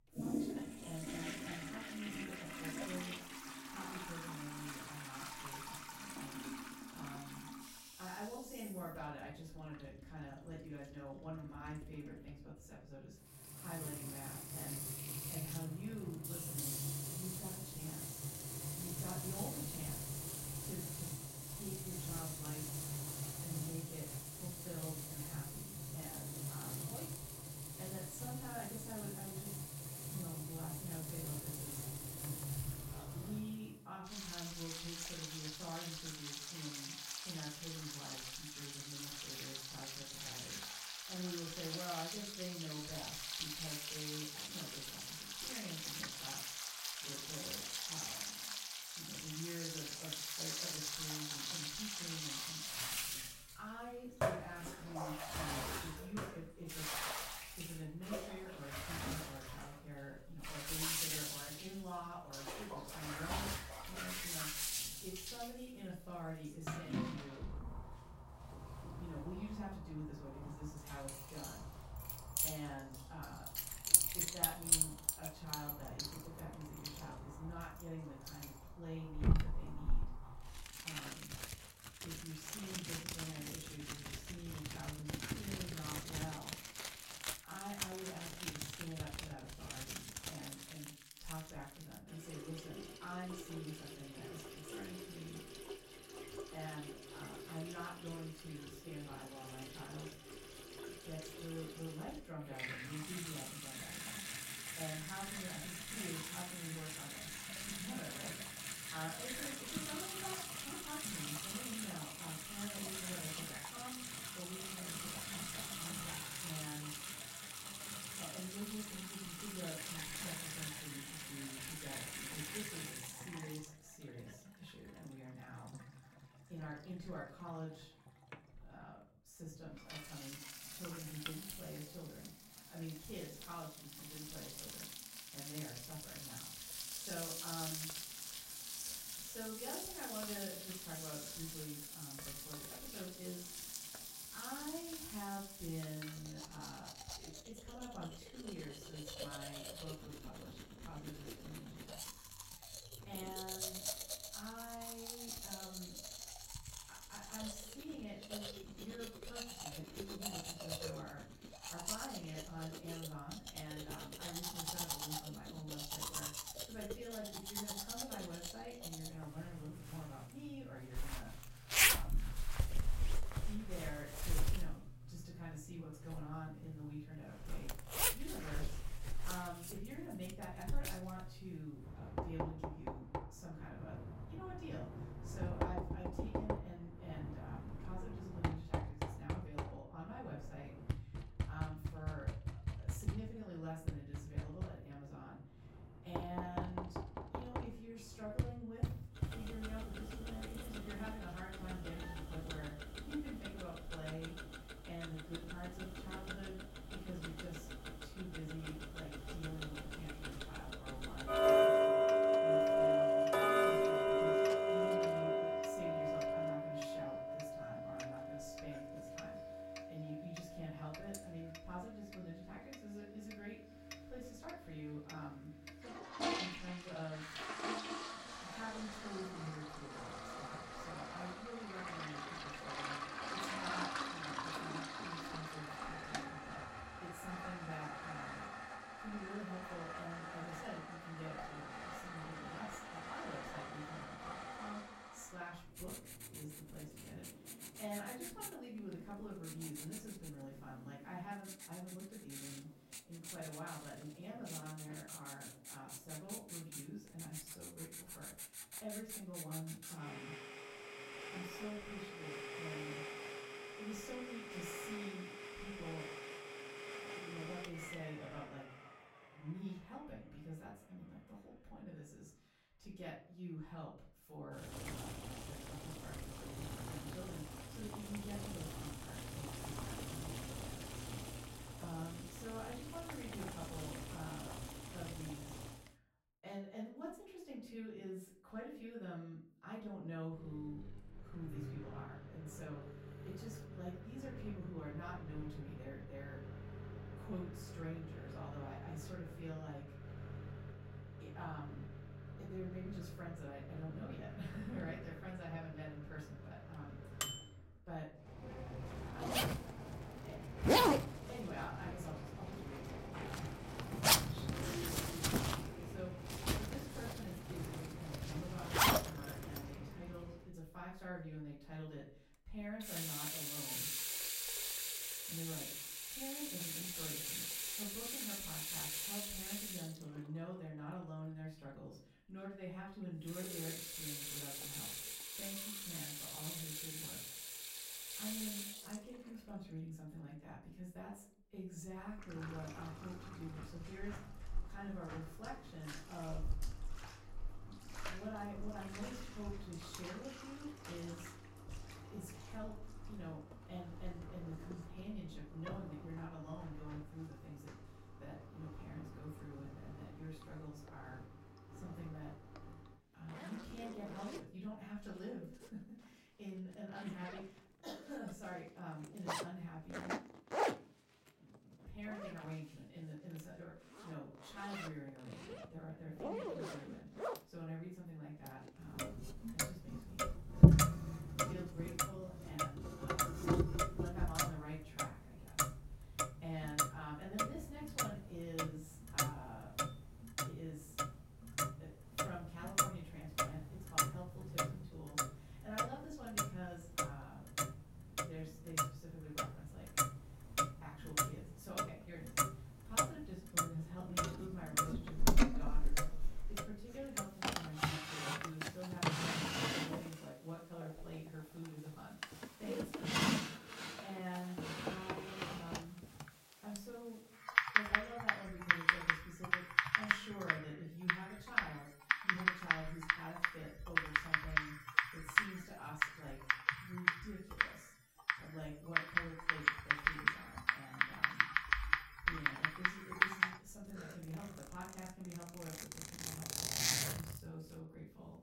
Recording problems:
off-mic speech; far
room echo; noticeable; dies away in 0.4 s
household noises; very loud; throughout; 9 dB above the speech

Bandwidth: 16 kHz